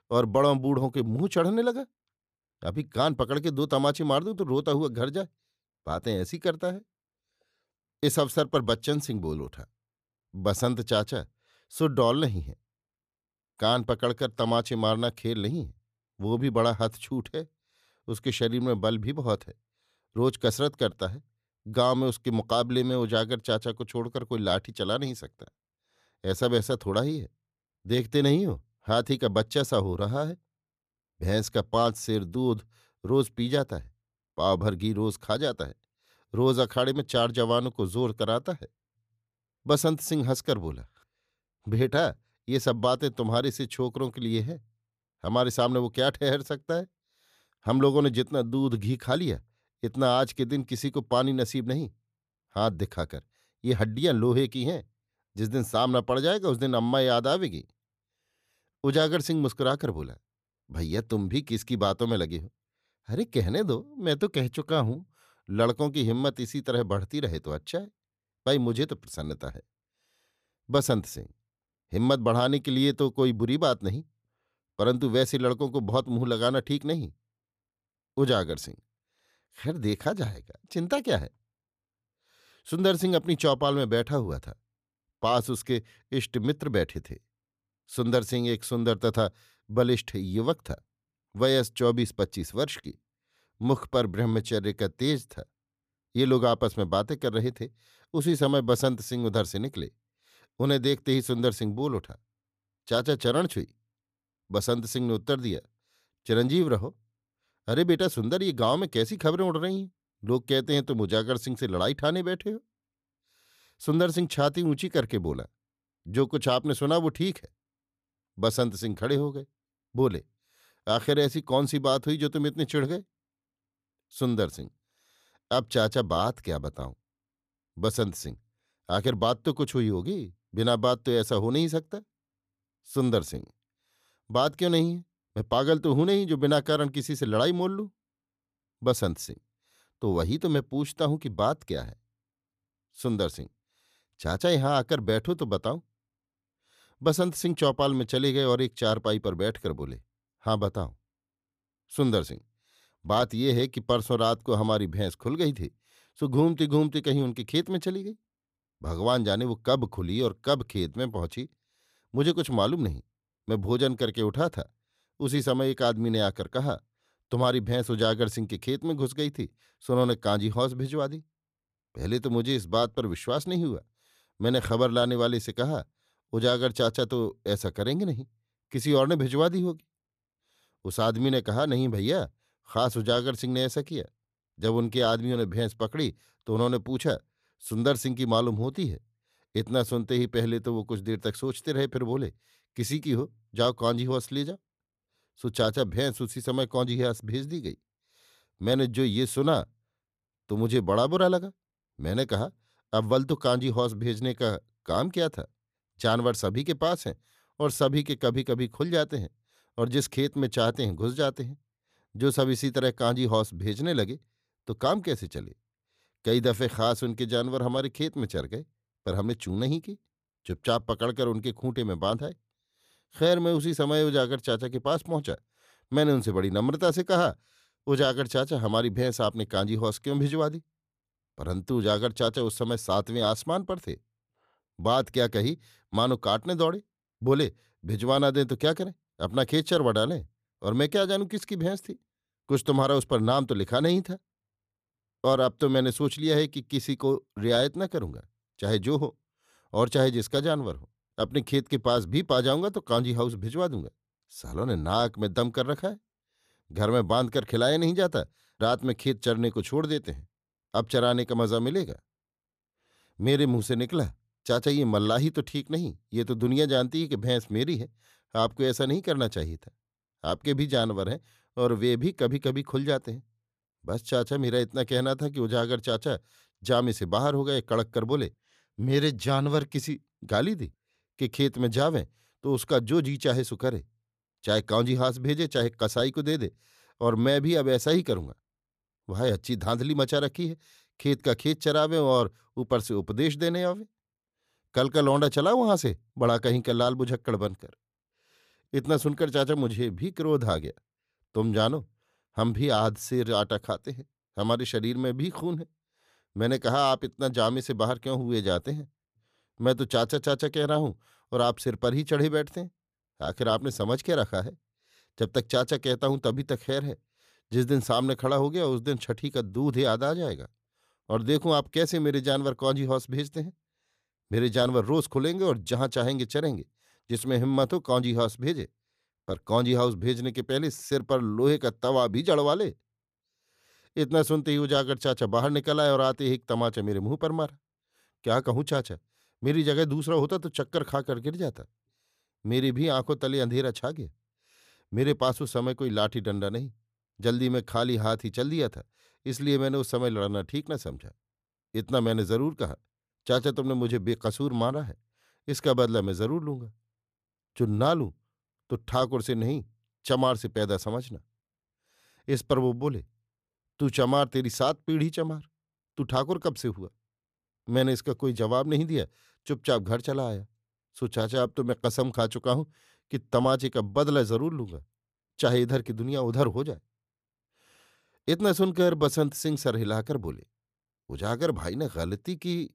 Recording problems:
none

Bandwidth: 14.5 kHz